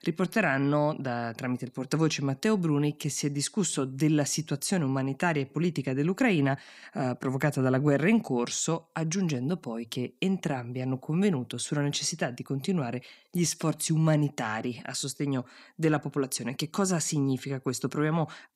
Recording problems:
none

